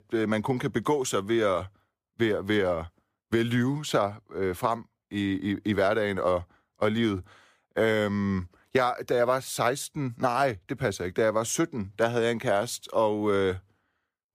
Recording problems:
none

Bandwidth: 15 kHz